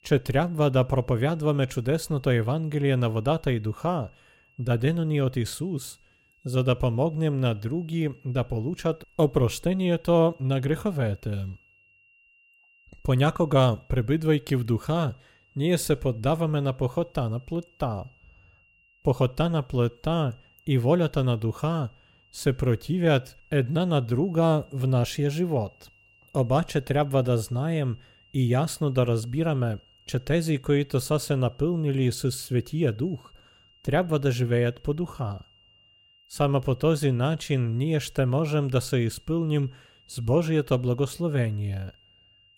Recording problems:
high-pitched whine; faint; throughout; 3 kHz, 30 dB below the speech

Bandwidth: 16 kHz